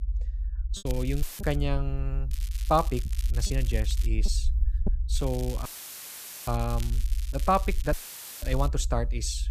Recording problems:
crackling; noticeable; at 1 s, from 2.5 to 4 s and from 5 to 8.5 s; 15 dB below the speech
low rumble; faint; throughout; 20 dB below the speech
choppy; occasionally; at 1 s and from 3 to 4.5 s; 3% of the speech affected
audio cutting out; filled with static; at 1 s, at 5.5 s for 1 s and at 8 s

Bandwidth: 14.5 kHz